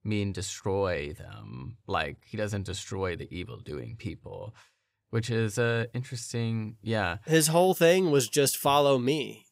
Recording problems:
none

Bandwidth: 15.5 kHz